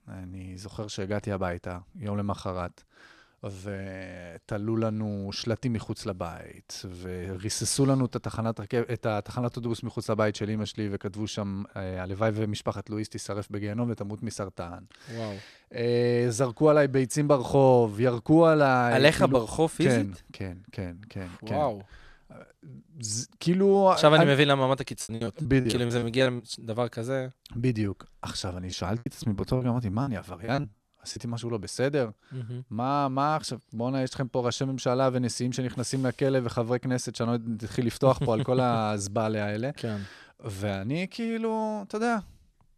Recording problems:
choppy; very; from 25 to 26 s and from 29 to 31 s; 19% of the speech affected

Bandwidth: 13.5 kHz